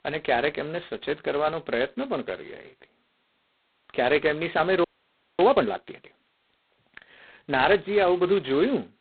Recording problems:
phone-call audio; poor line; nothing above 4 kHz
audio freezing; at 5 s for 0.5 s

